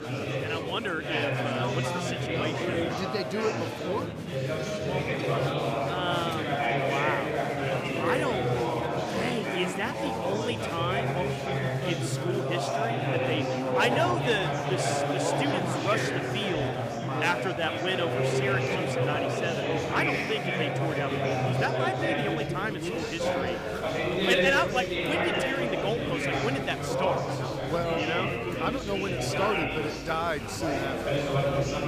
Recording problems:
chatter from many people; very loud; throughout; 3 dB above the speech

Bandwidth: 15 kHz